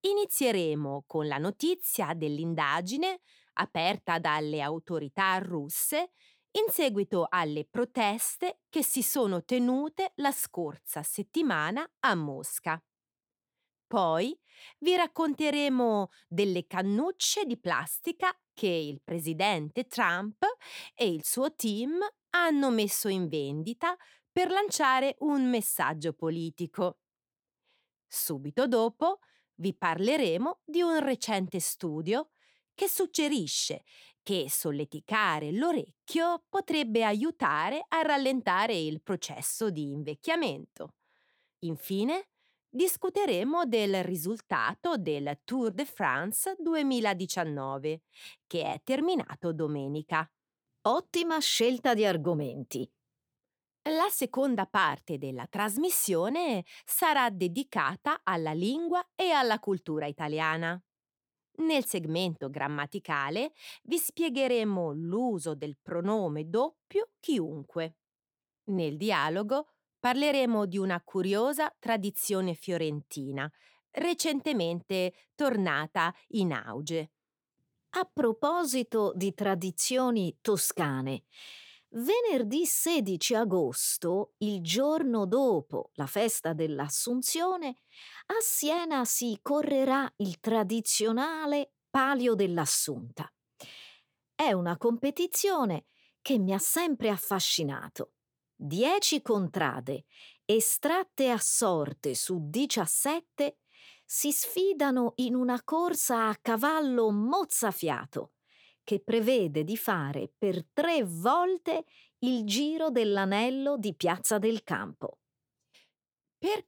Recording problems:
none

